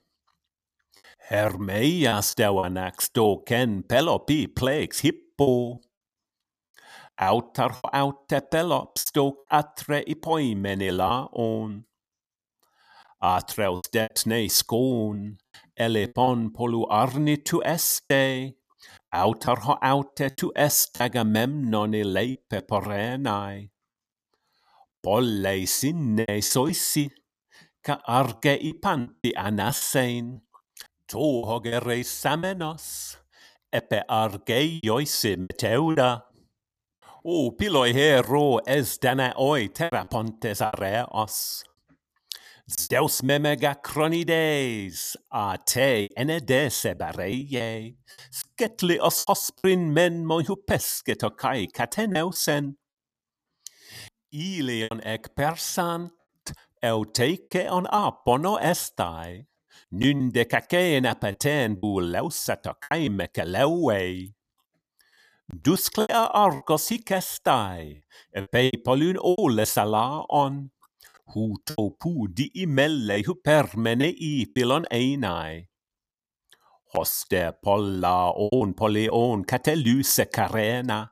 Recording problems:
choppy; very; 5% of the speech affected

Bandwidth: 14.5 kHz